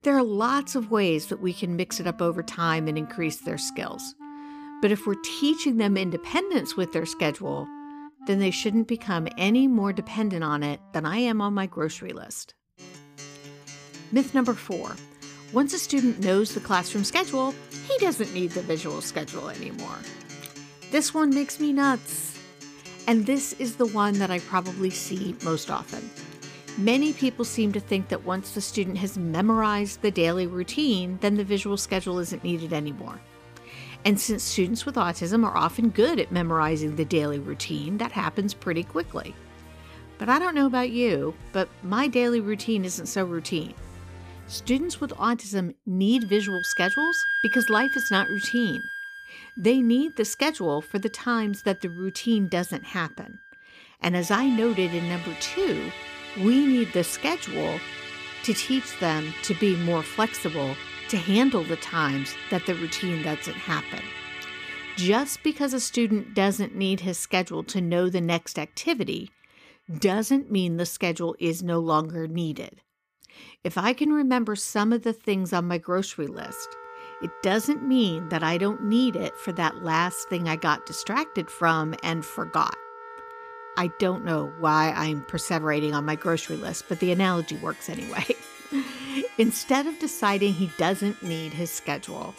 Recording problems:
background music; noticeable; throughout; 10 dB below the speech

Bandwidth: 15 kHz